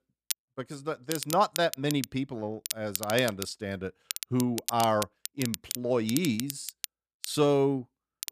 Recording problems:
crackle, like an old record; loud; 7 dB below the speech

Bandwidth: 14.5 kHz